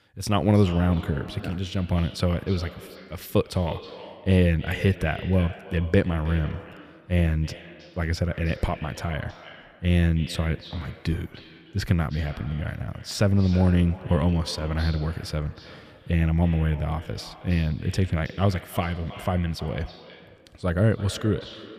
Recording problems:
echo of what is said; noticeable; throughout; 320 ms later, 15 dB below the speech

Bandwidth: 15 kHz